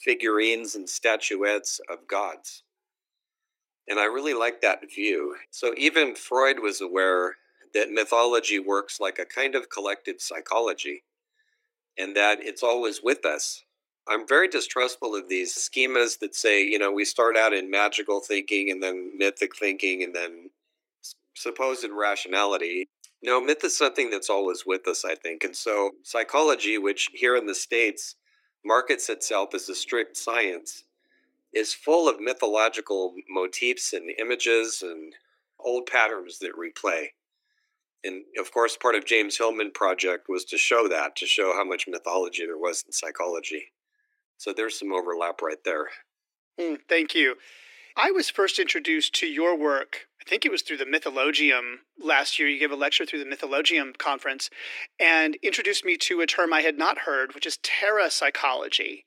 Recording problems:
thin; somewhat; fading below 300 Hz

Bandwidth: 16.5 kHz